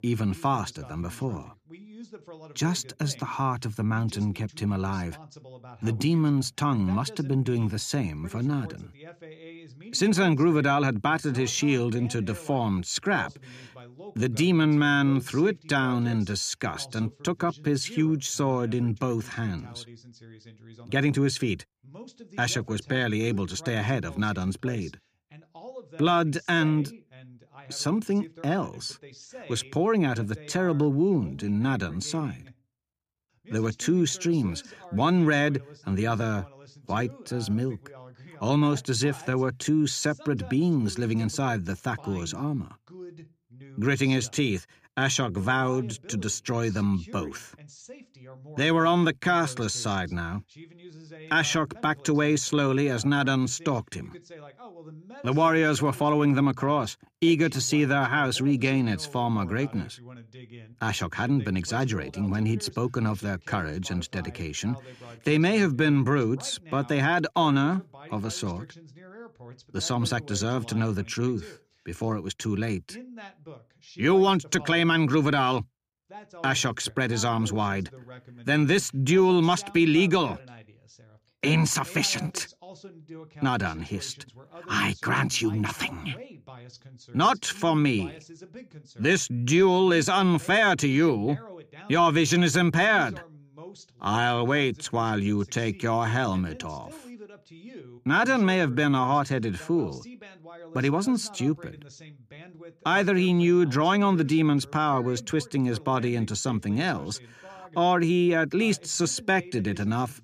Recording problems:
voice in the background; faint; throughout; 20 dB below the speech

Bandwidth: 15 kHz